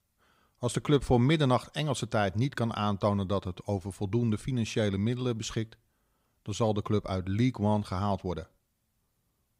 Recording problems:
none

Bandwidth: 15.5 kHz